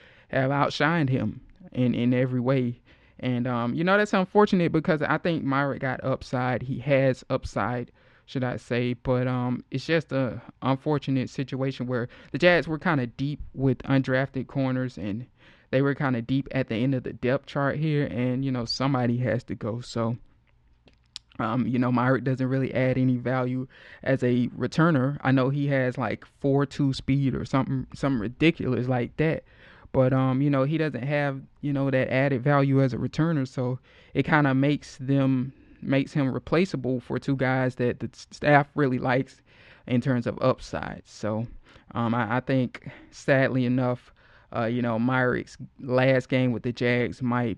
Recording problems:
muffled; slightly; fading above 2.5 kHz

